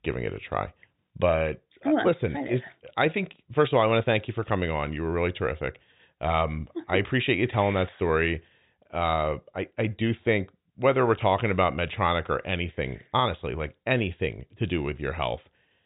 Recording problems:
high frequencies cut off; severe; nothing above 4 kHz

